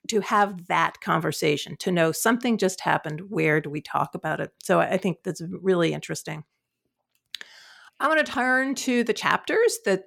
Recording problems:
none

